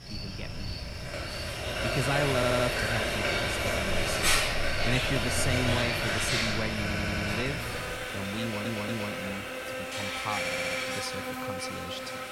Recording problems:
household noises; very loud; throughout; 4 dB above the speech
animal sounds; loud; throughout; 3 dB below the speech
voice in the background; faint; throughout; 25 dB below the speech
audio stuttering; 4 times, first at 2.5 s

